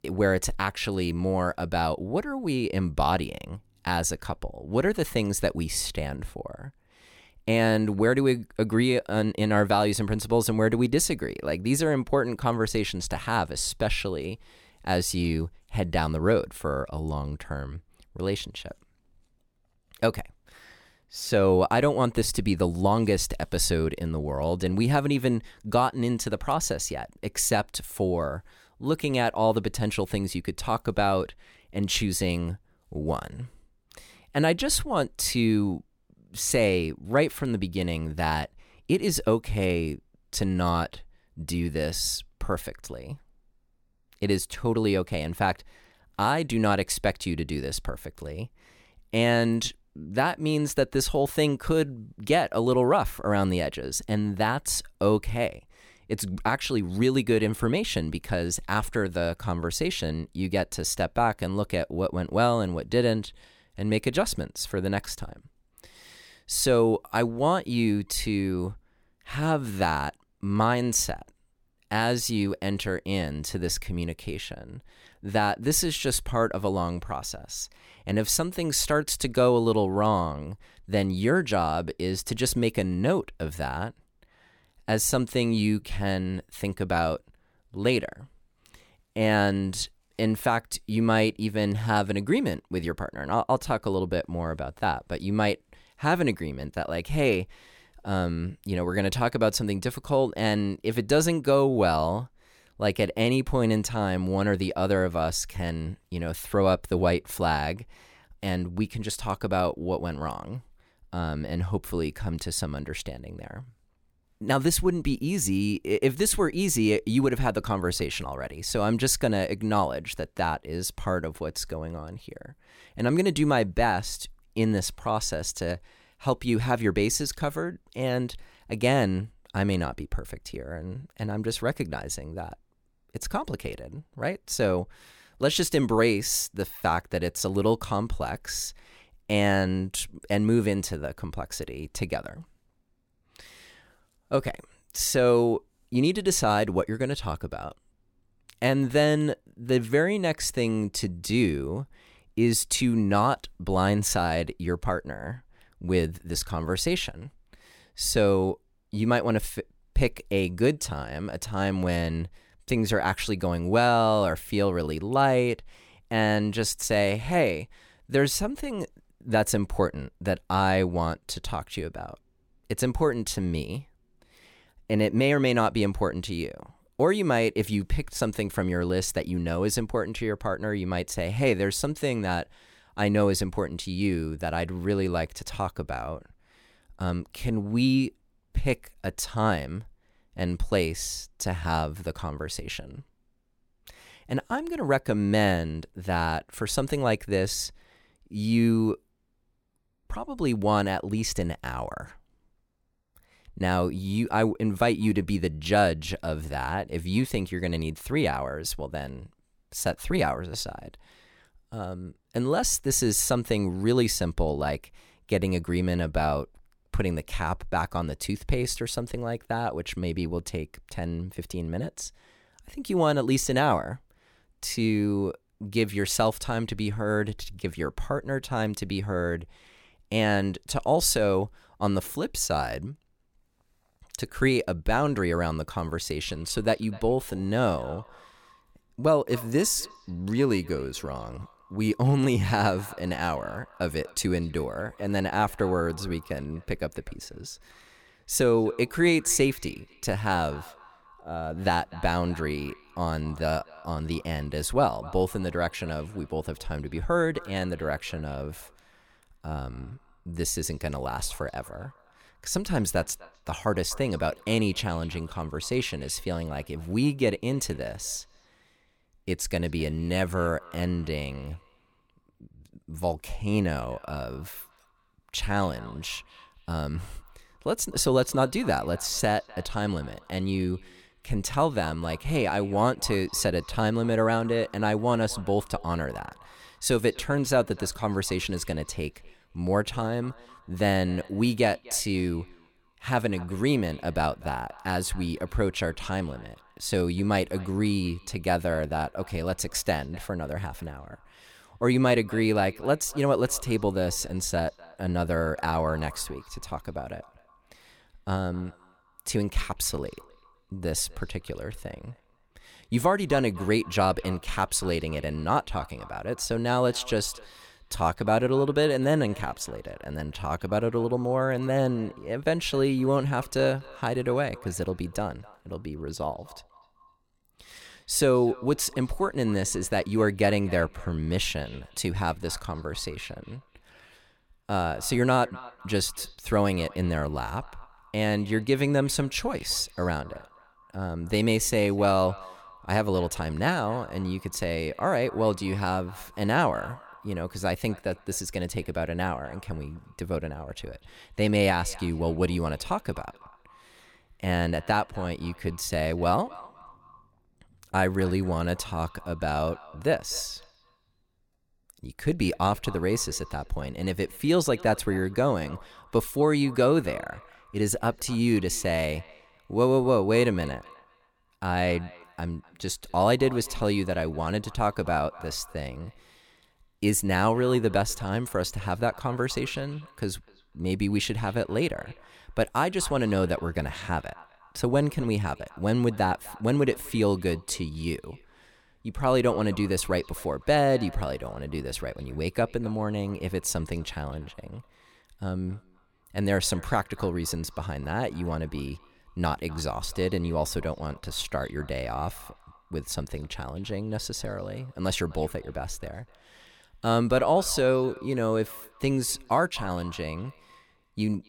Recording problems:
echo of what is said; faint; from 3:56 on; 250 ms later, 25 dB below the speech

